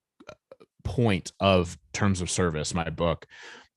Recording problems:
none

